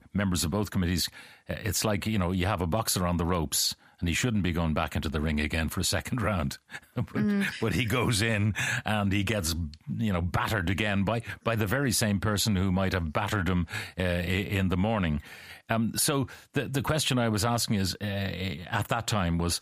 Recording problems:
squashed, flat; heavily

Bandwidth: 15 kHz